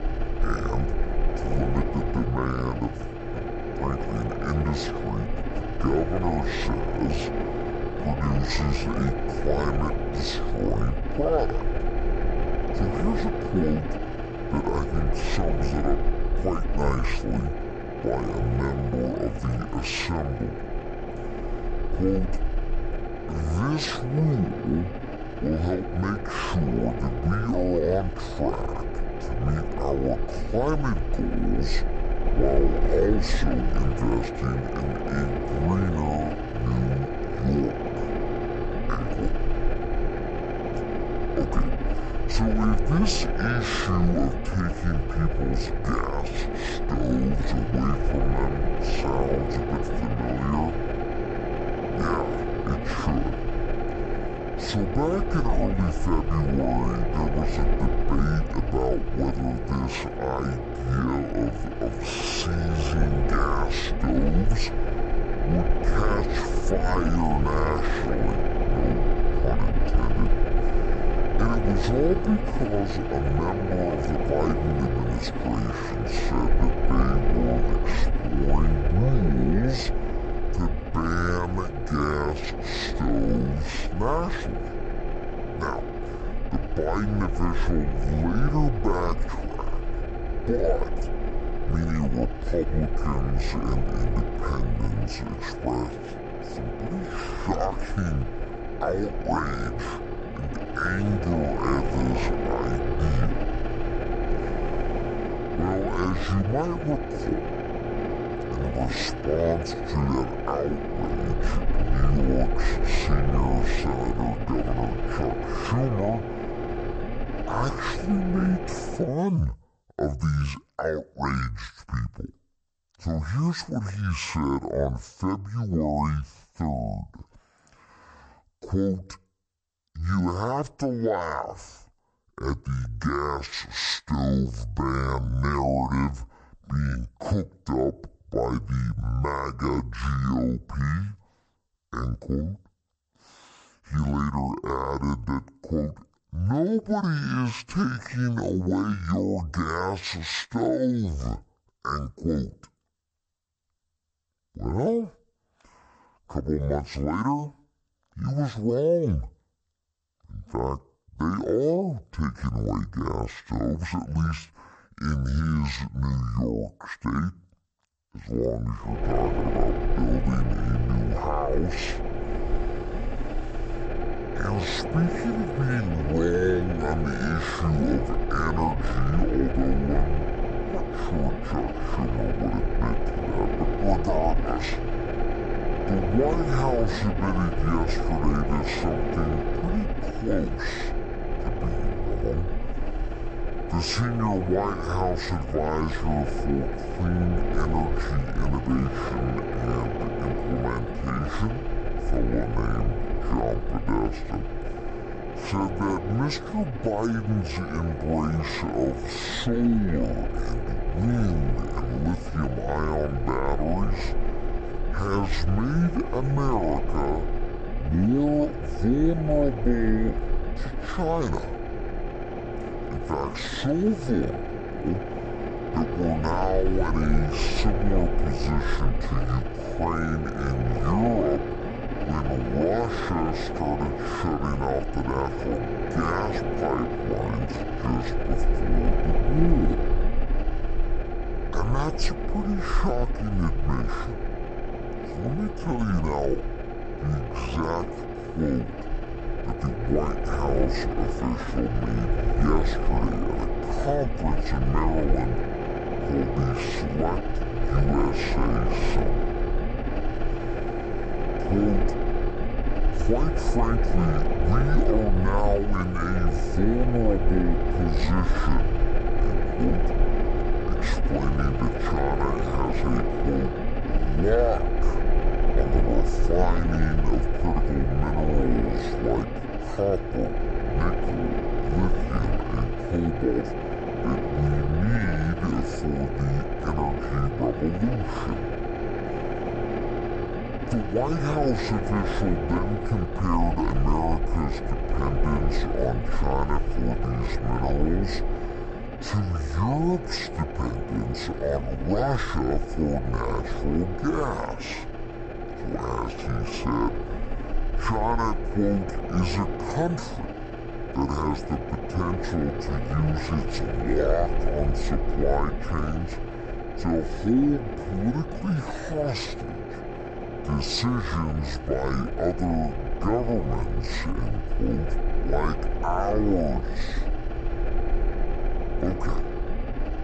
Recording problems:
wrong speed and pitch; too slow and too low; 0.6 times normal speed
low rumble; loud; until 1:59 and from 2:49 on; 3 dB below the speech

